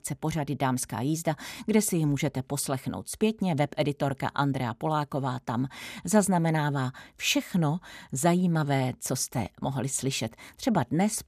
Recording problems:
none

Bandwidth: 14.5 kHz